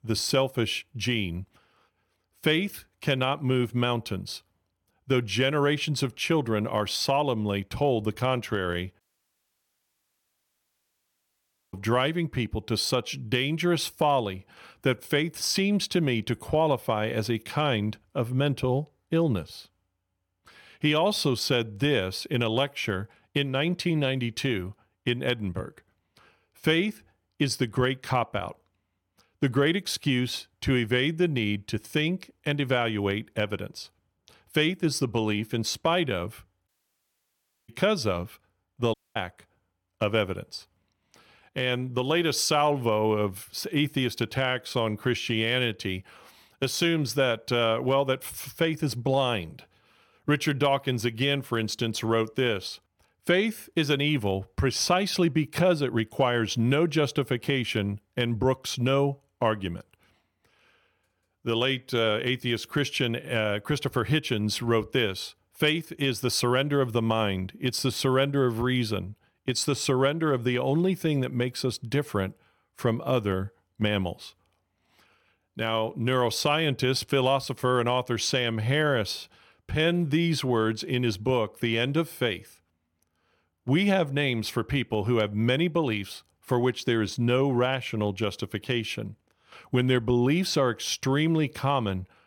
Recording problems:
audio cutting out; at 9 s for 2.5 s, at 37 s for 1 s and at 39 s

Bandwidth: 17.5 kHz